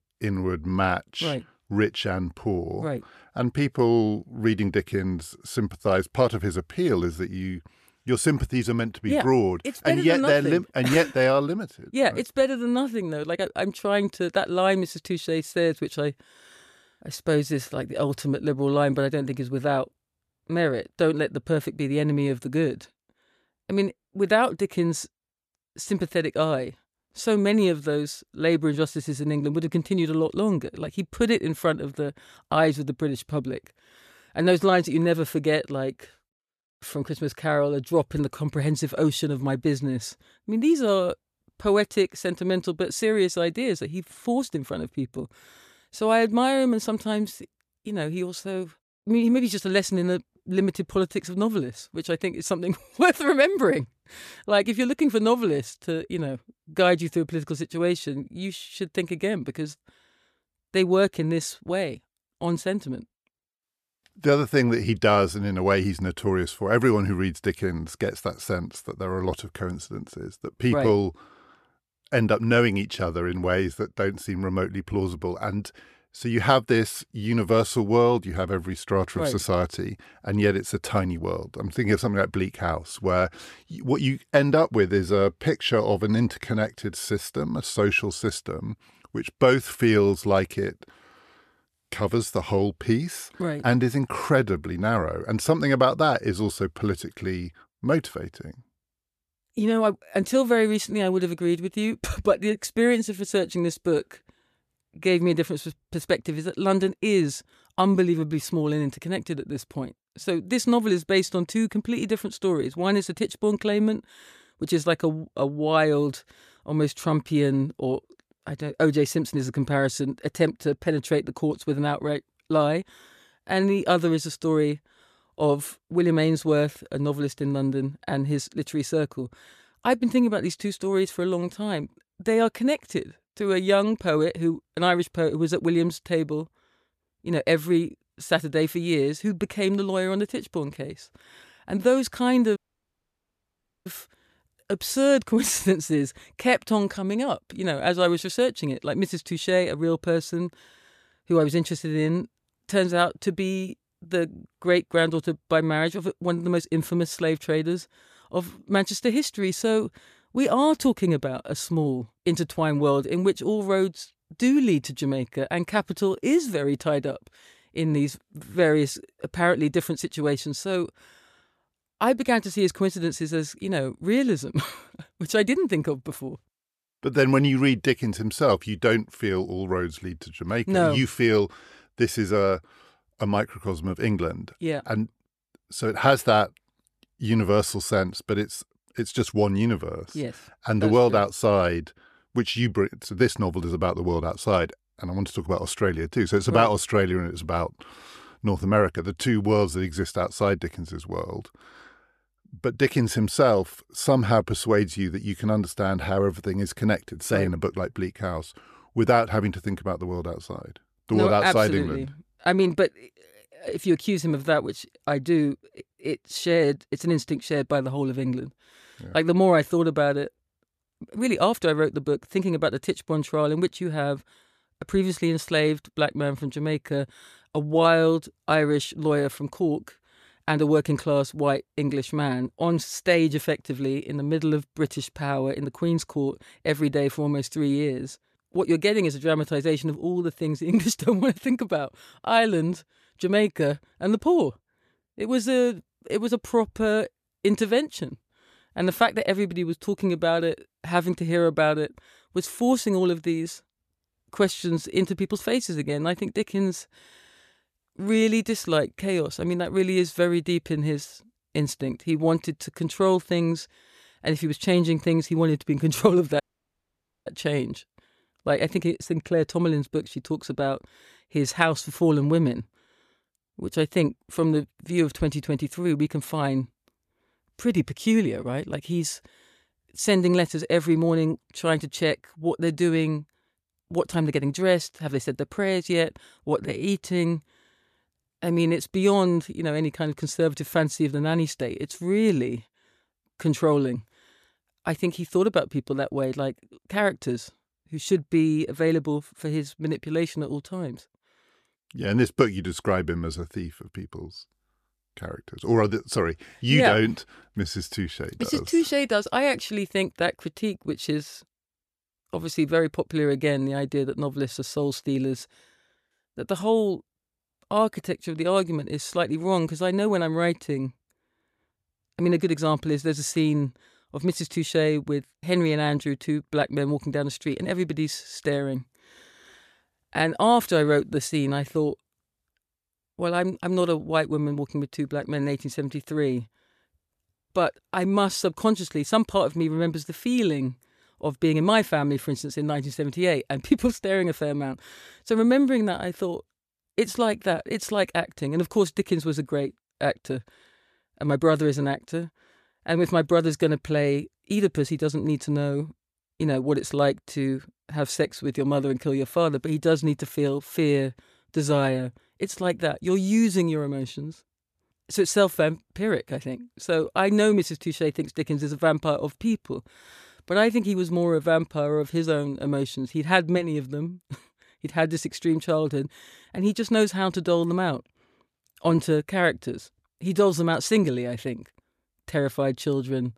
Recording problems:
audio cutting out; at 2:23 for 1.5 s and at 4:26 for 1 s

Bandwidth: 14.5 kHz